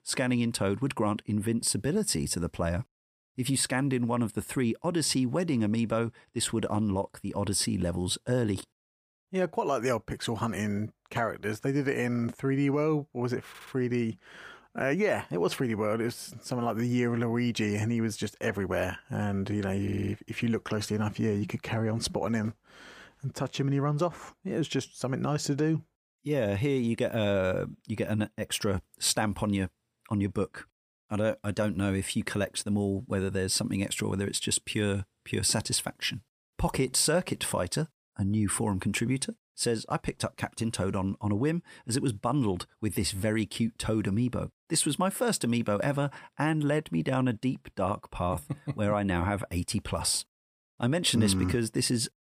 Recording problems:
audio stuttering; at 13 s and at 20 s

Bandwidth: 15 kHz